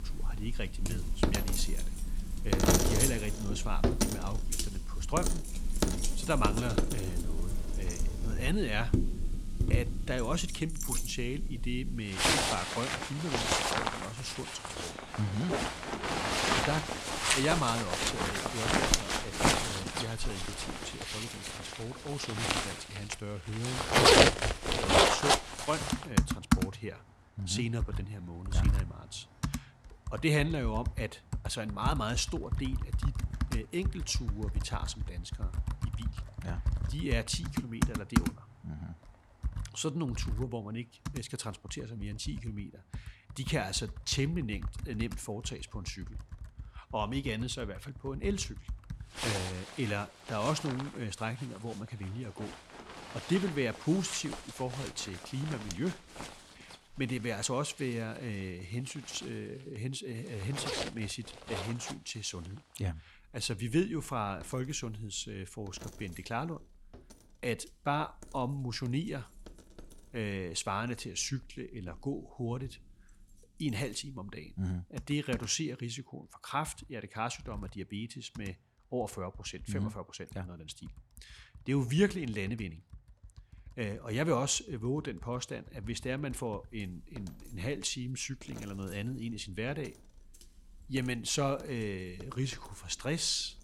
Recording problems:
household noises; very loud; throughout; 4 dB above the speech

